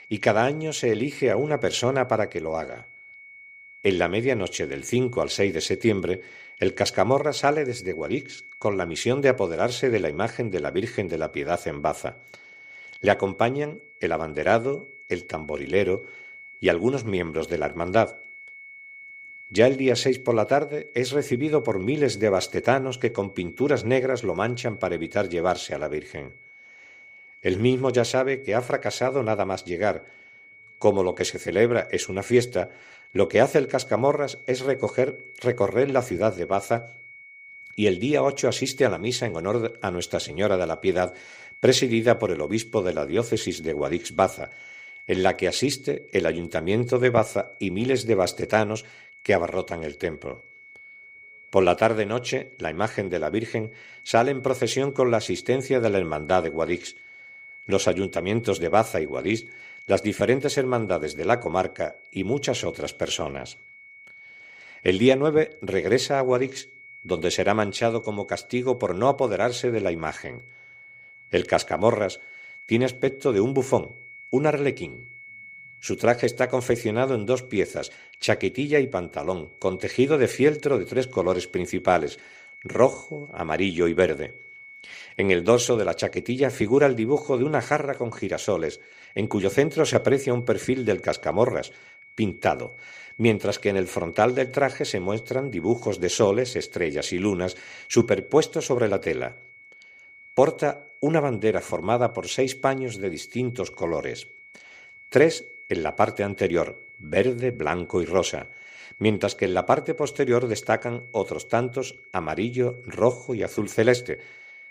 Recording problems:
high-pitched whine; noticeable; throughout; 2 kHz, 20 dB below the speech

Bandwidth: 14.5 kHz